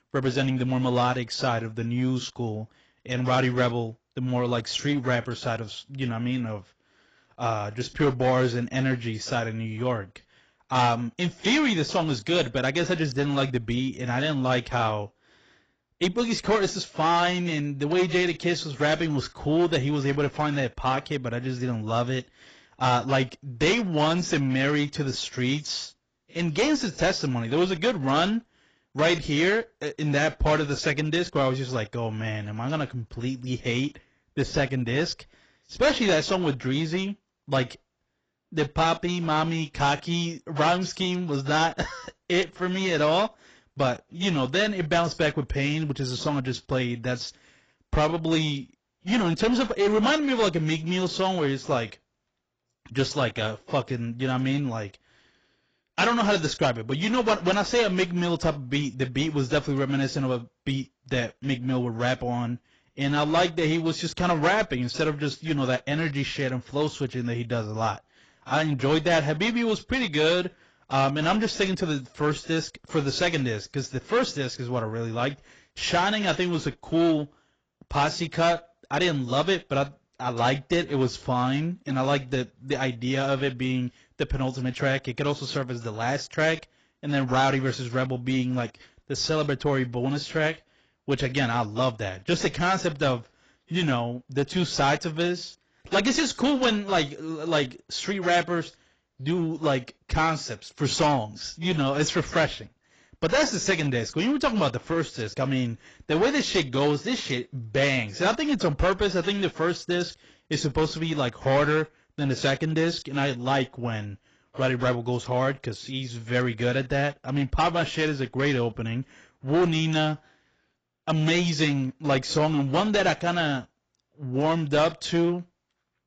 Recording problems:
garbled, watery; badly; nothing above 7.5 kHz
distortion; slight; 7% of the sound clipped

